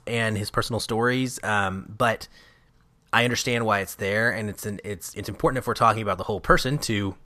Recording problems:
uneven, jittery; strongly; from 0.5 to 6.5 s

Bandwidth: 14.5 kHz